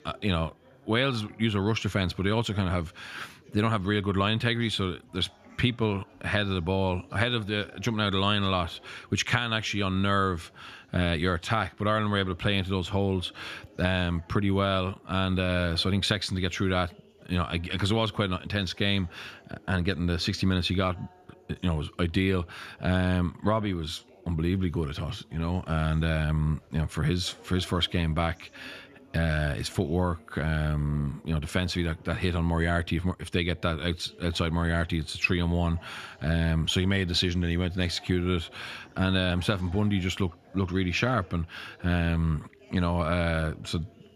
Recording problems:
background chatter; faint; throughout; 3 voices, 25 dB below the speech

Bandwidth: 14.5 kHz